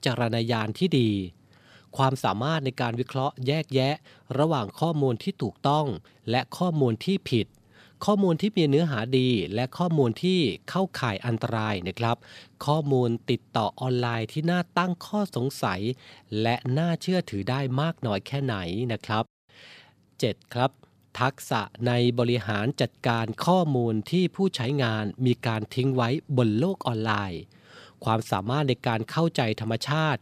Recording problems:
none

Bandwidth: 14.5 kHz